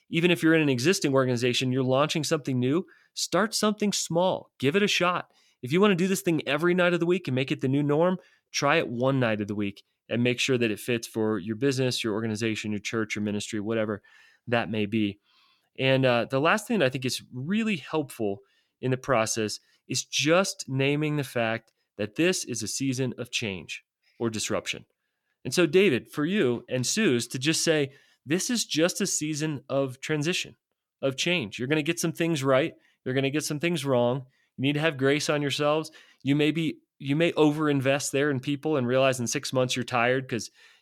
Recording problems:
none

